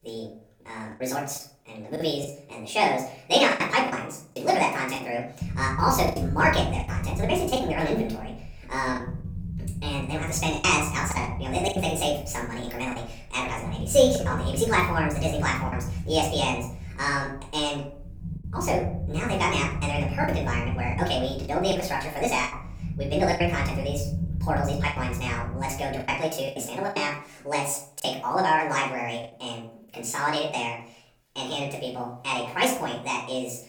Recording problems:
off-mic speech; far
wrong speed and pitch; too fast and too high; 1.6 times normal speed
room echo; slight; dies away in 0.4 s
low rumble; noticeable; from 5.5 to 26 s; 20 dB below the speech
choppy; very; 6% of the speech affected

